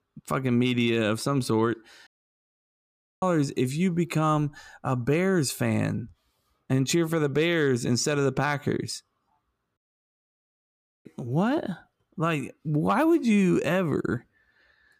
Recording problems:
audio cutting out; at 2 s for 1 s and at 10 s for 1.5 s

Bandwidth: 15 kHz